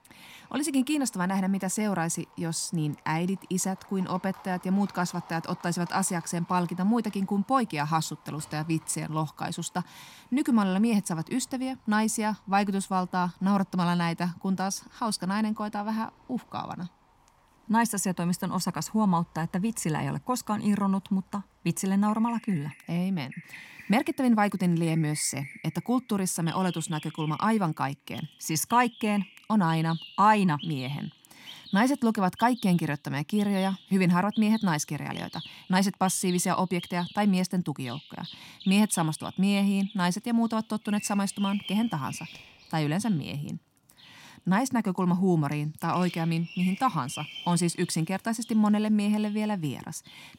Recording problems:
animal sounds; noticeable; throughout; 20 dB below the speech

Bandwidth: 16.5 kHz